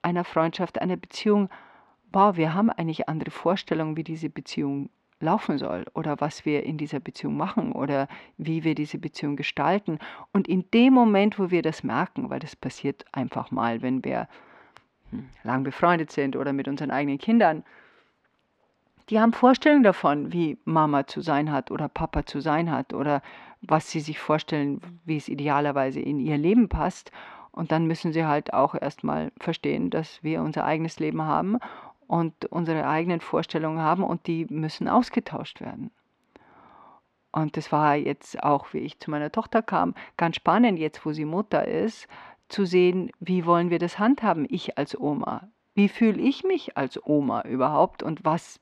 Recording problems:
muffled; very slightly; fading above 3.5 kHz

